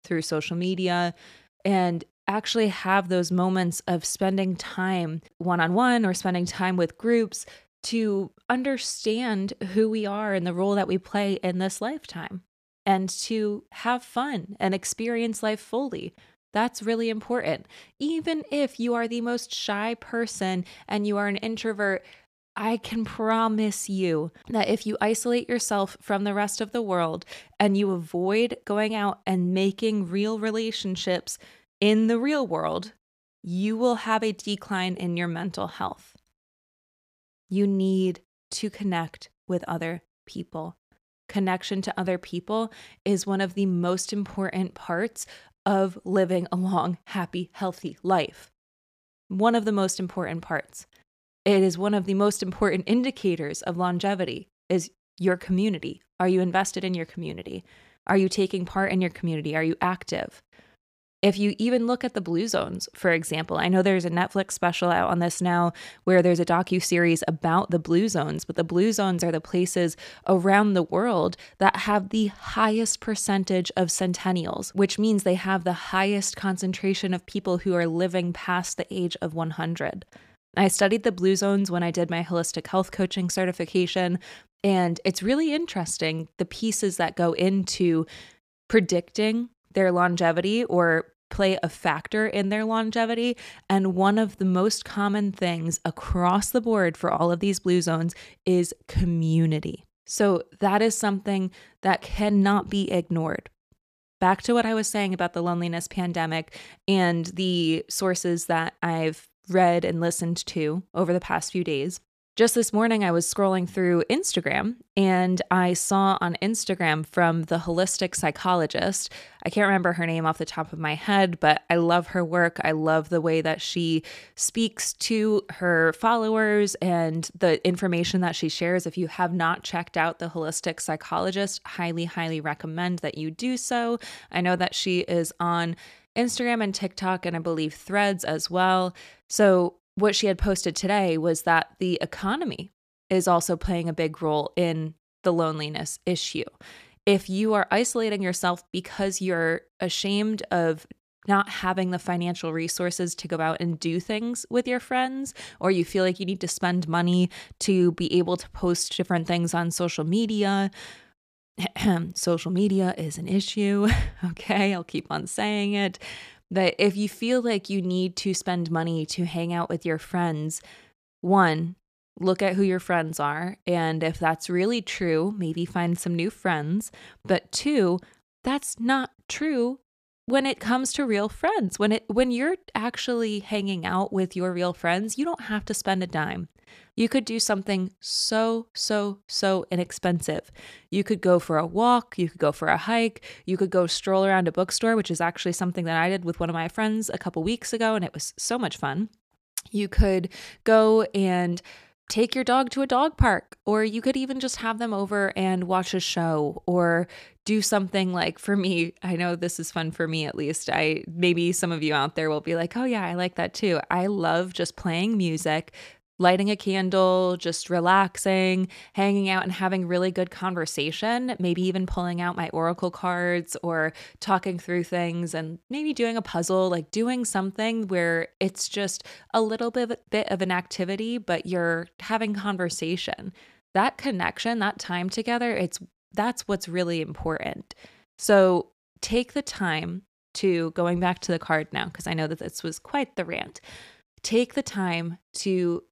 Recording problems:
none

